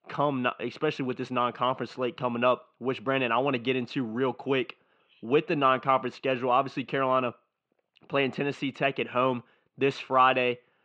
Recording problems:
muffled; very; fading above 3.5 kHz

